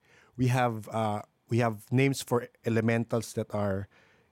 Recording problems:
none

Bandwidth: 16 kHz